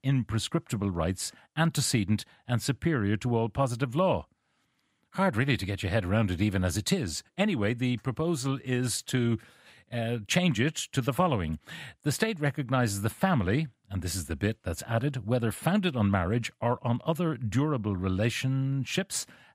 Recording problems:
none

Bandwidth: 15.5 kHz